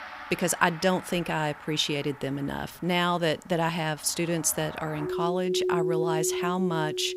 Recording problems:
background music; loud; throughout; 4 dB below the speech

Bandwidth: 15.5 kHz